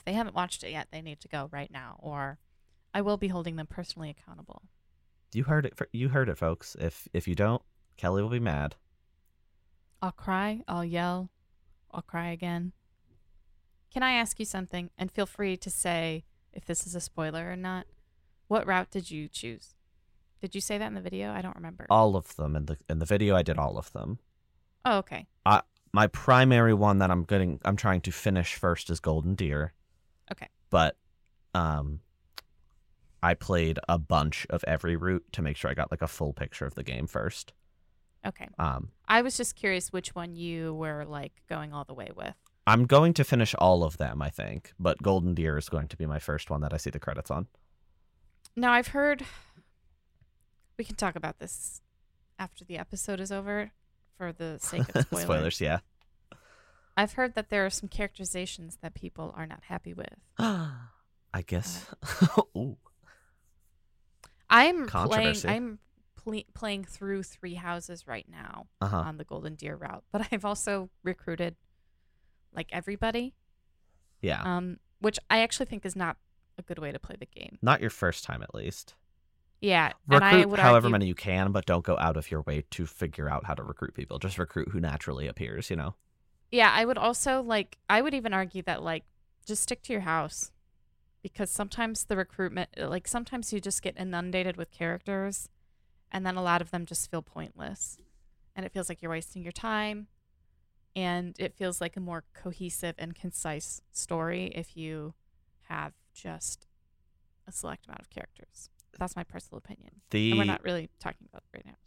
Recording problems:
none

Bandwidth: 16 kHz